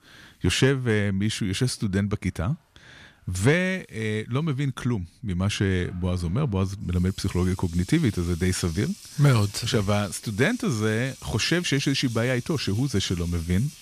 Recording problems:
household noises; noticeable; throughout; 20 dB below the speech

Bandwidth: 14.5 kHz